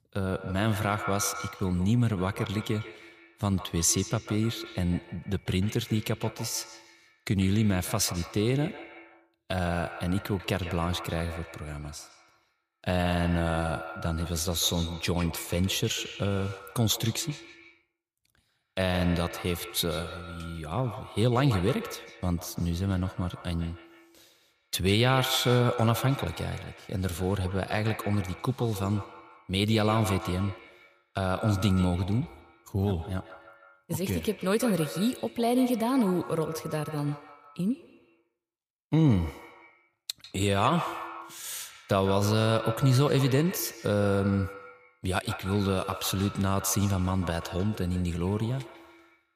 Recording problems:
echo of what is said; strong; throughout; 140 ms later, 10 dB below the speech

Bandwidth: 15 kHz